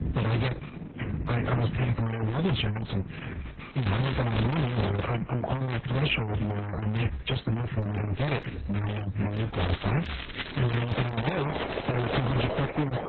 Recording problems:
distortion; heavy; 40% of the sound clipped
garbled, watery; badly; nothing above 6.5 kHz
rain or running water; loud; throughout; 9 dB below the speech
crackling; loud; from 4 to 5 s and from 9.5 to 12 s; 9 dB below the speech
background music; noticeable; throughout; 15 dB below the speech

